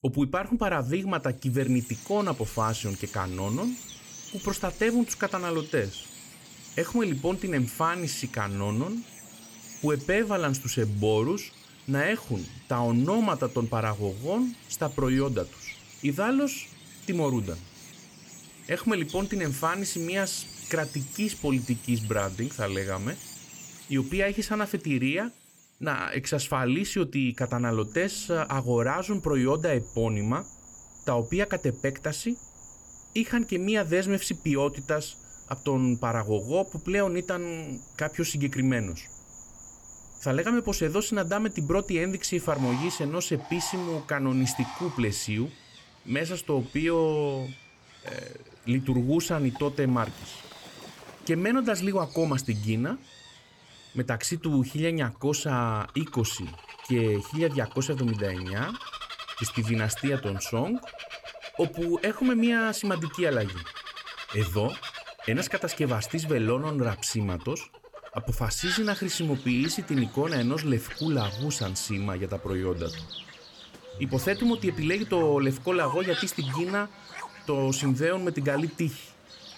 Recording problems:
animal sounds; noticeable; throughout; 15 dB below the speech

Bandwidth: 17.5 kHz